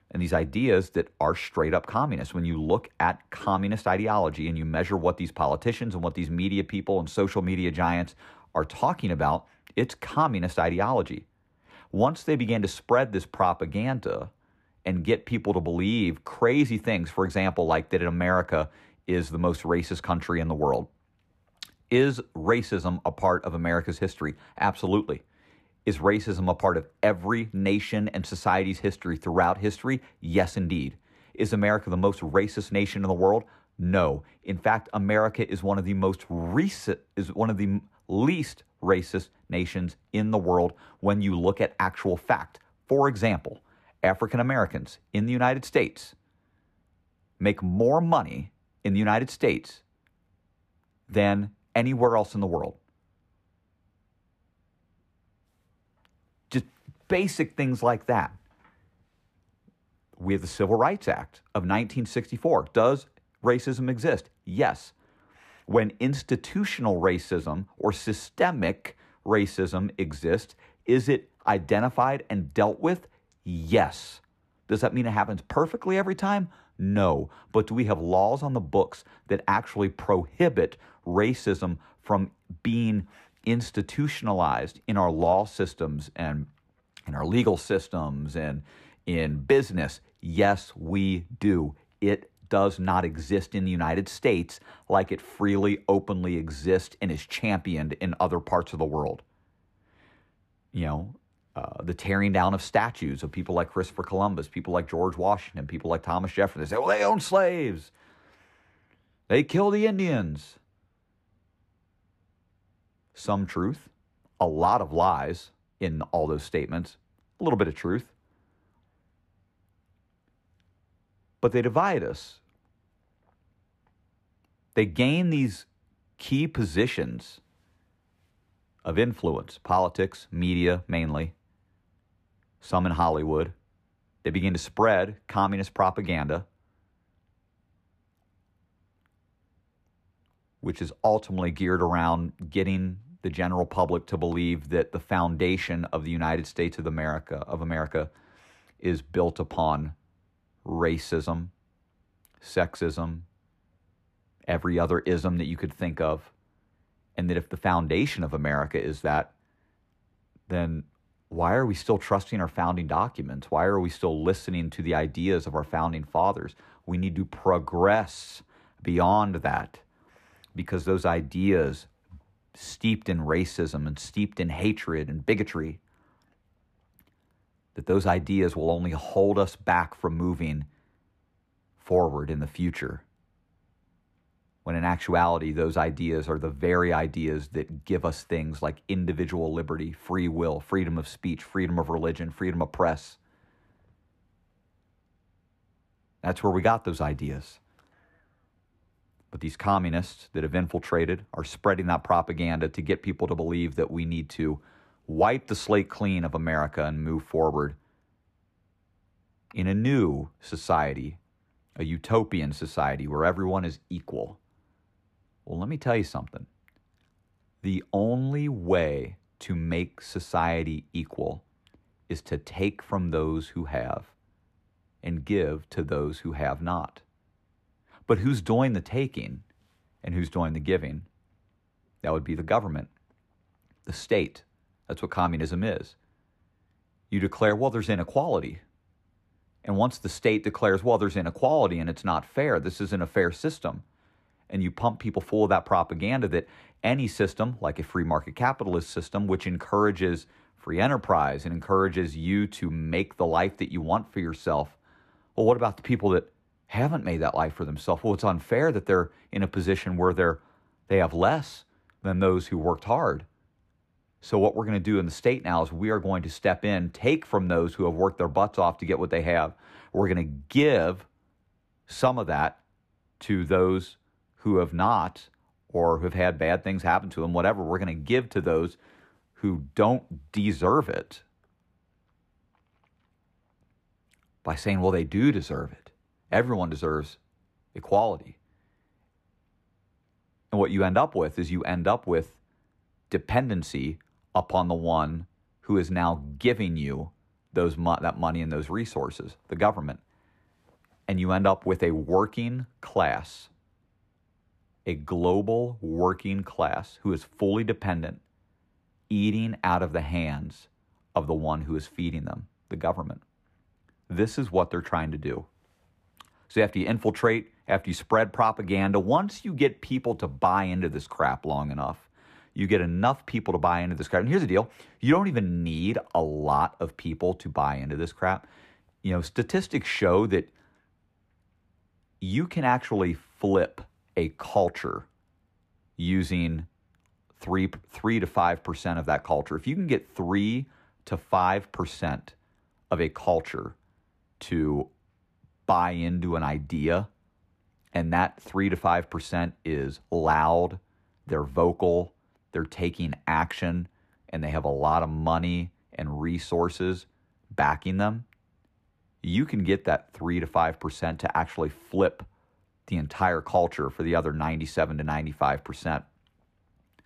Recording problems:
muffled; slightly; fading above 3.5 kHz

